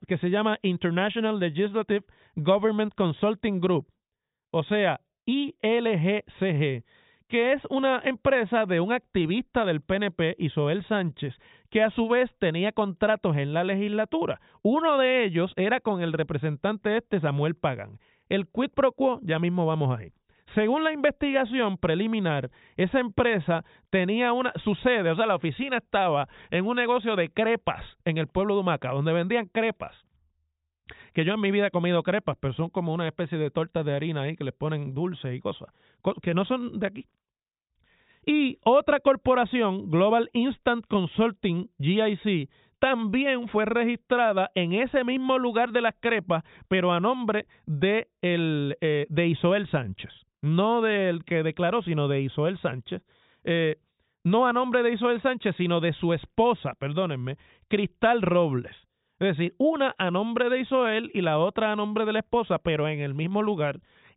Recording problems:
high frequencies cut off; severe; nothing above 4 kHz

